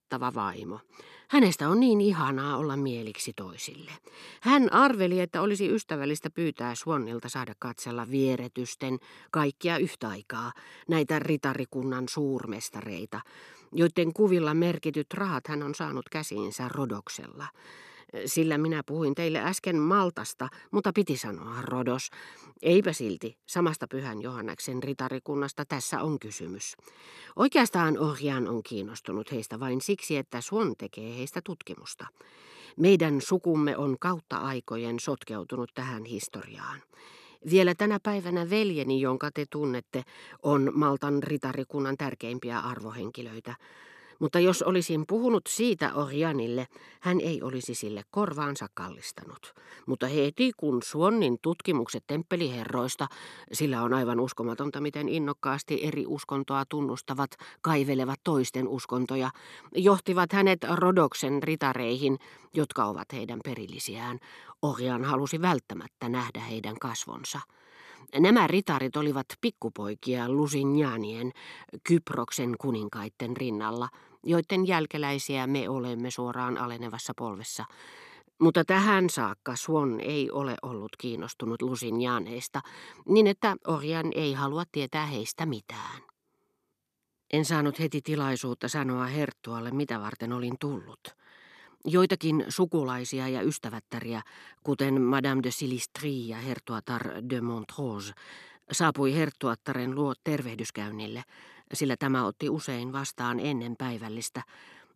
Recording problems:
none

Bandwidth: 13.5 kHz